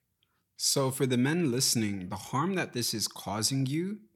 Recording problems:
none

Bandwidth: 17.5 kHz